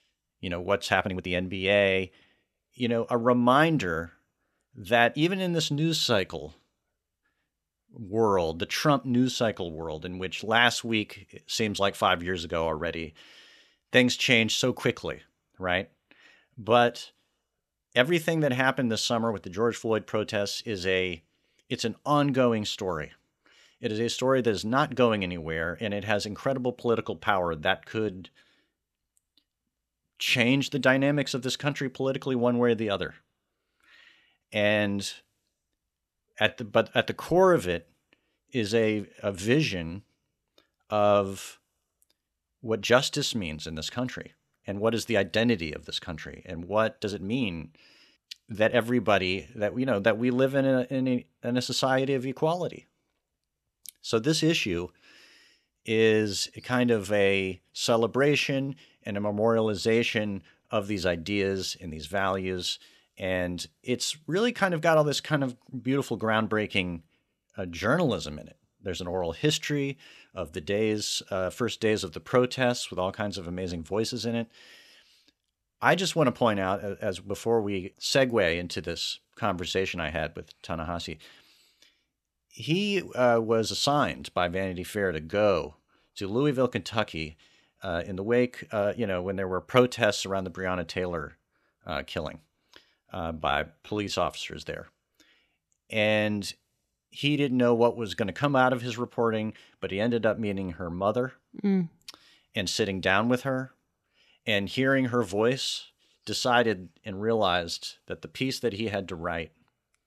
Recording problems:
uneven, jittery; strongly; from 1 s to 1:34

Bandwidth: 14 kHz